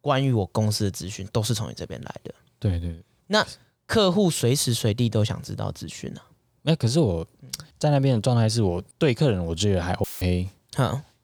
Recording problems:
audio cutting out; filled with static; at 10 s

